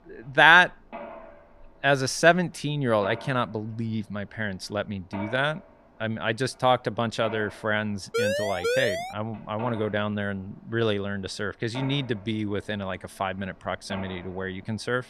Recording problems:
machinery noise; noticeable; throughout; 15 dB below the speech
siren; noticeable; at 8 s; peak level with the speech

